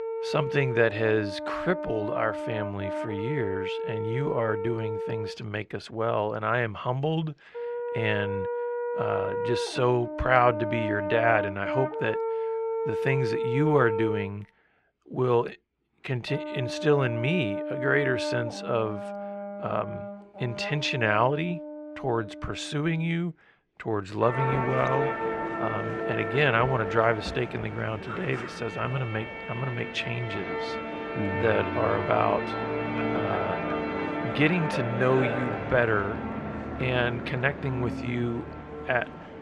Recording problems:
muffled; slightly; fading above 3 kHz
background music; loud; throughout; 4 dB below the speech

